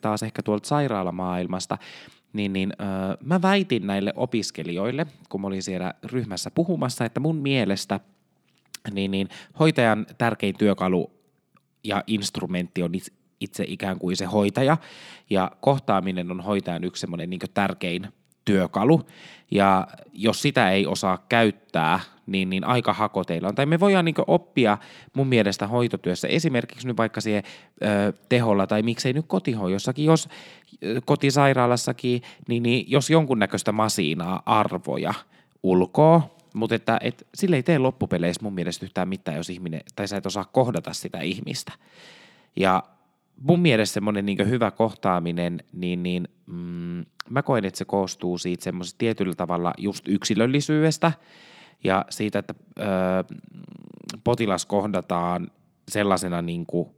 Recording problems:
none

